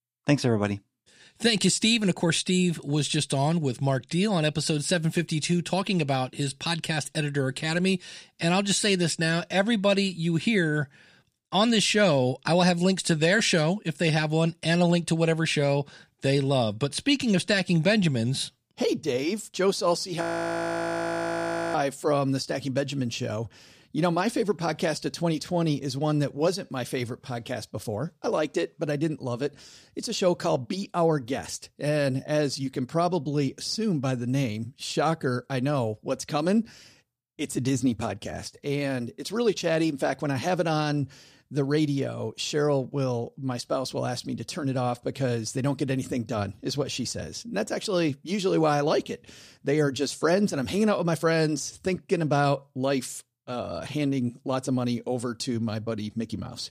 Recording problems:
audio freezing; at 20 s for 1.5 s

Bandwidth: 15 kHz